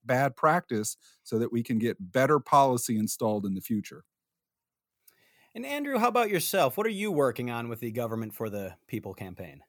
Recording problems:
none

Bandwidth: 19 kHz